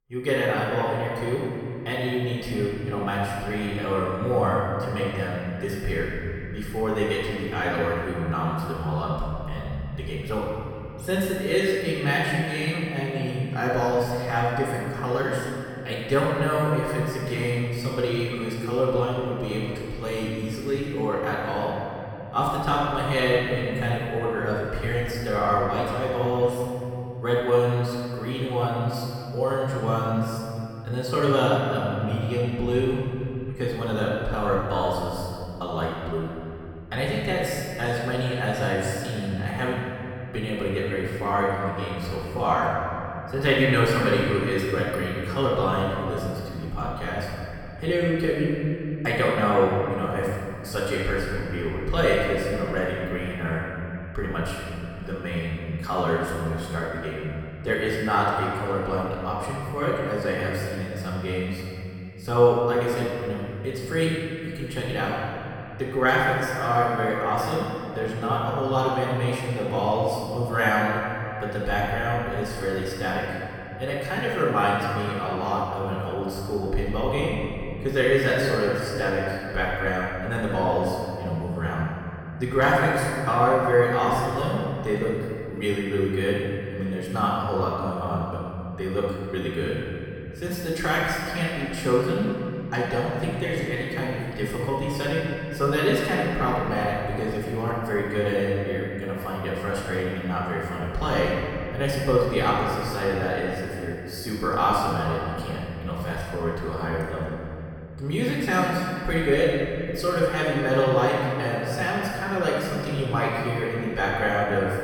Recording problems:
room echo; strong; dies away in 2.9 s
off-mic speech; far

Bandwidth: 18 kHz